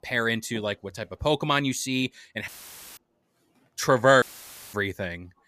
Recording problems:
audio cutting out; filled with static; at 2.5 s and at 4 s for 0.5 s

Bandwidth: 14.5 kHz